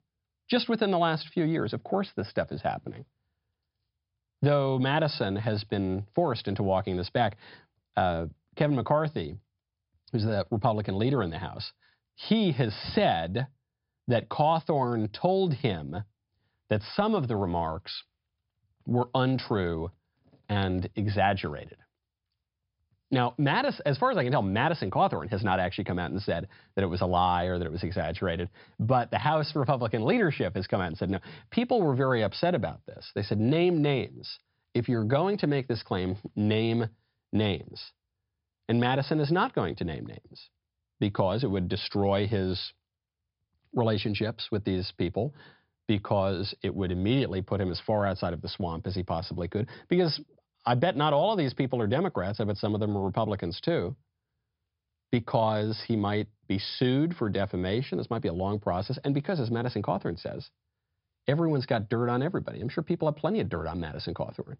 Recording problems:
high frequencies cut off; noticeable; nothing above 5.5 kHz

